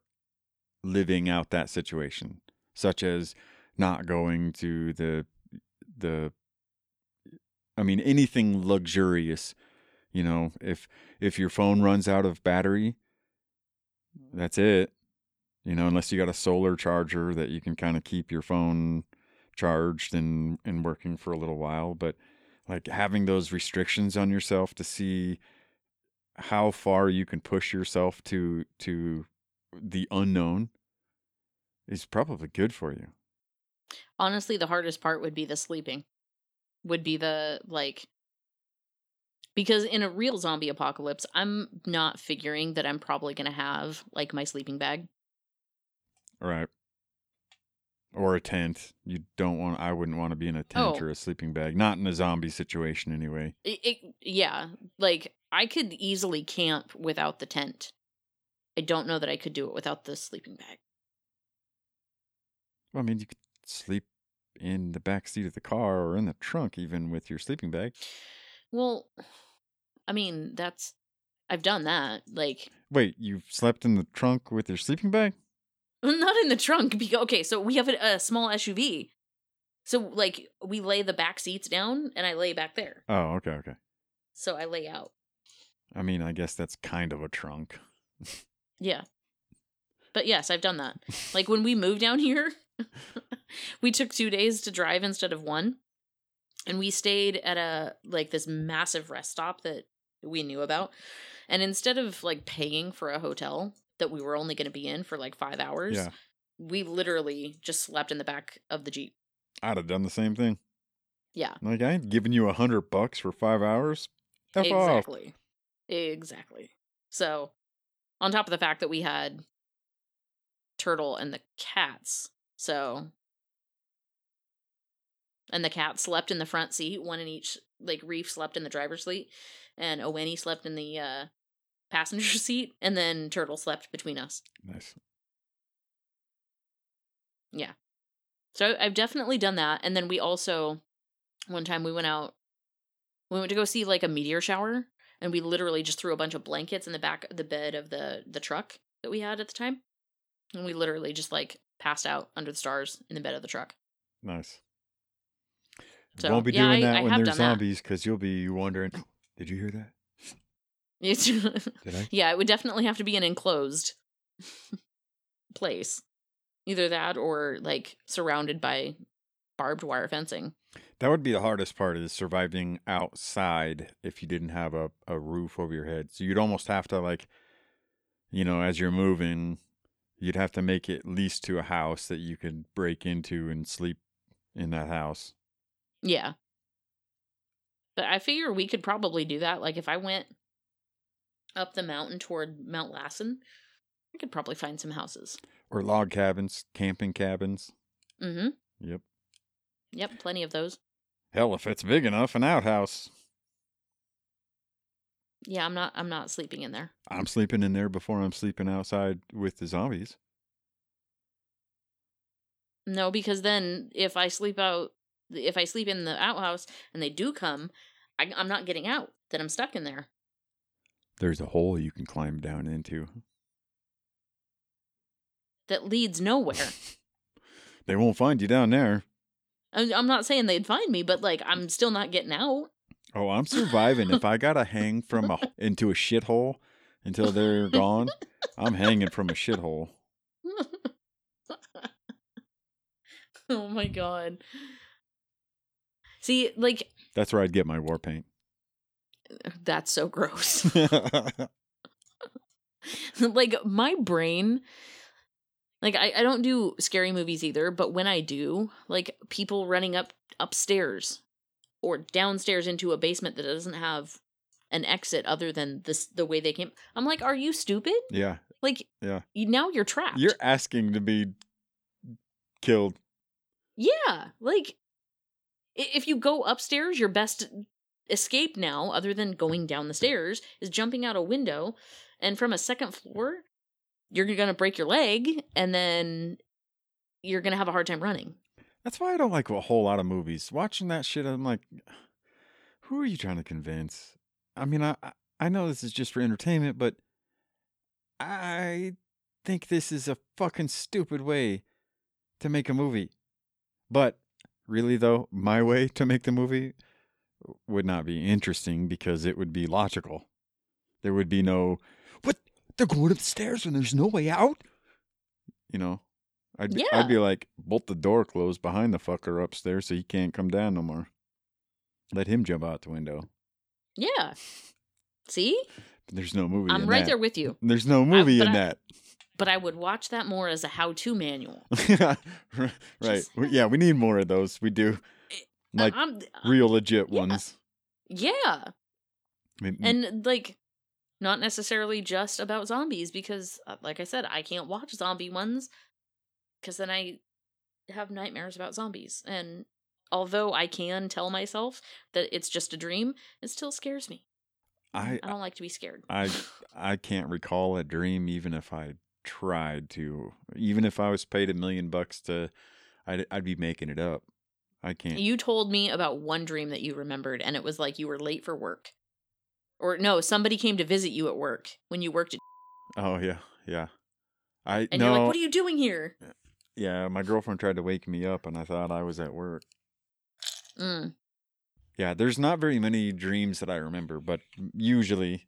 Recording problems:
none

